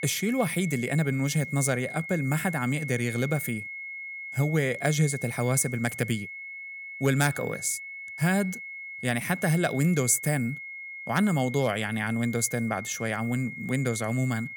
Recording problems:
high-pitched whine; loud; throughout; 2 kHz, 10 dB below the speech

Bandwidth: 18.5 kHz